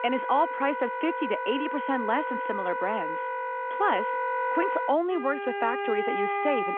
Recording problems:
phone-call audio
background music; loud; throughout; 2 dB below the speech

